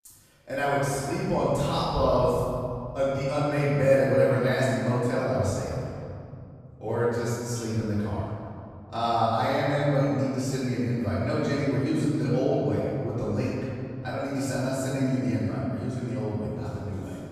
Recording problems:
room echo; strong; dies away in 2.3 s
off-mic speech; far

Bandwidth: 14.5 kHz